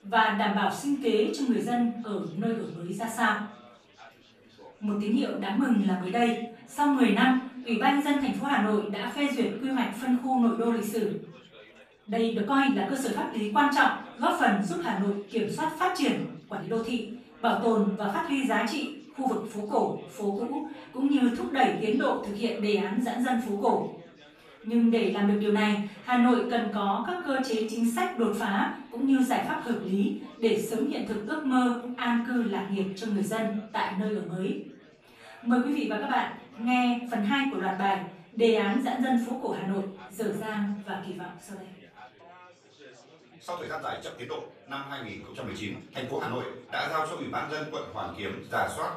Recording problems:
off-mic speech; far
room echo; noticeable; dies away in 0.5 s
thin; very slightly; fading below 1 kHz
chatter from many people; faint; throughout; 25 dB below the speech
uneven, jittery; strongly; from 12 to 47 s

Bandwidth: 15 kHz